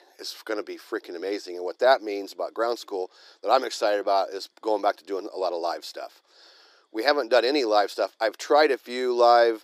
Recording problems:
thin; somewhat; fading below 300 Hz

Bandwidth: 15 kHz